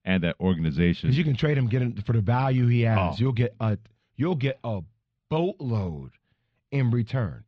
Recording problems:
muffled; slightly; fading above 4 kHz

